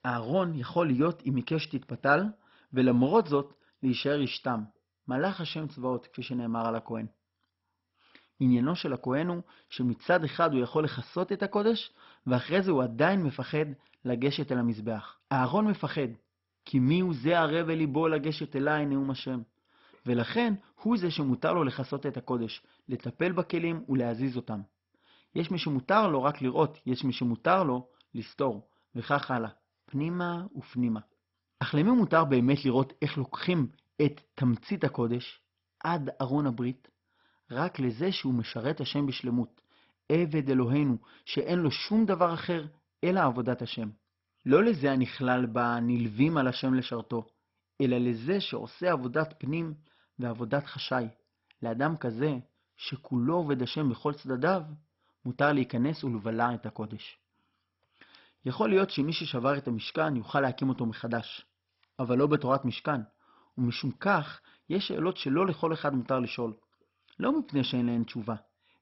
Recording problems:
garbled, watery; badly; nothing above 5.5 kHz

